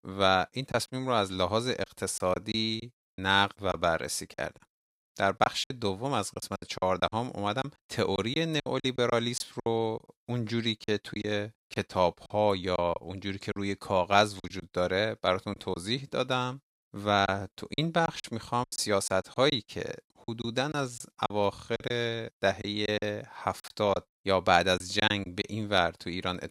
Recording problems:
choppy; very; 9% of the speech affected

